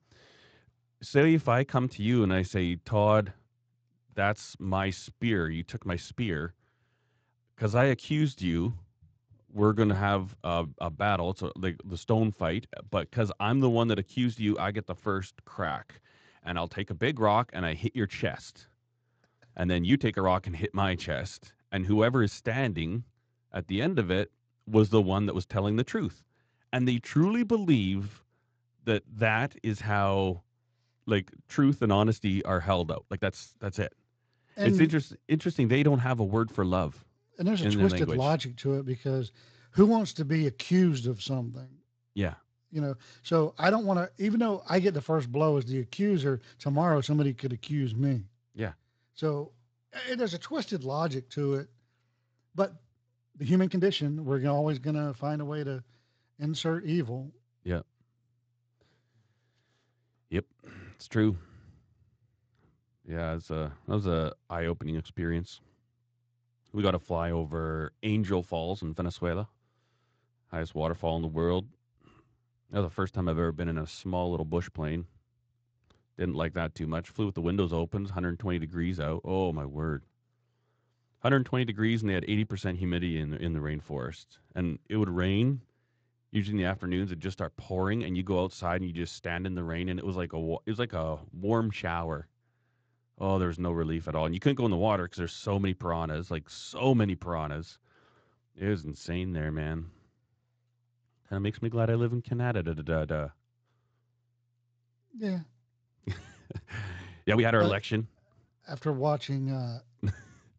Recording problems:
garbled, watery; slightly; nothing above 7.5 kHz
uneven, jittery; strongly; from 7.5 s to 1:48

